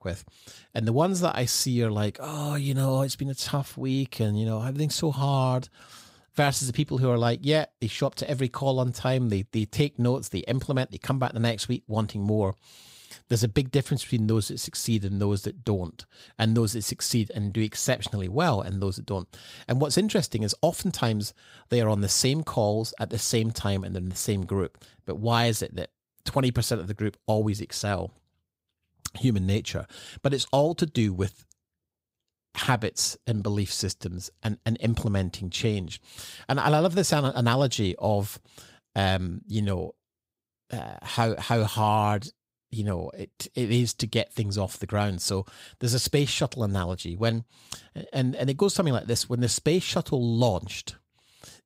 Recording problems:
none

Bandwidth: 15.5 kHz